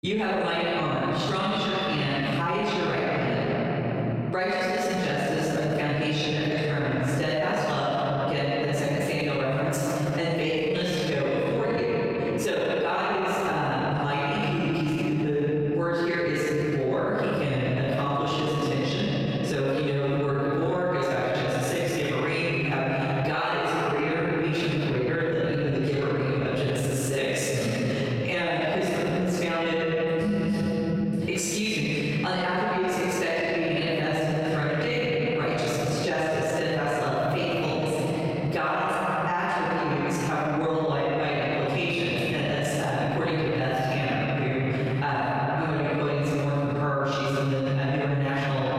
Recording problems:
room echo; strong; dies away in 3 s
off-mic speech; far
squashed, flat; somewhat

